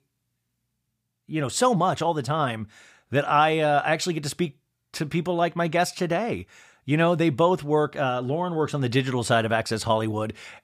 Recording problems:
none

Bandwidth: 15 kHz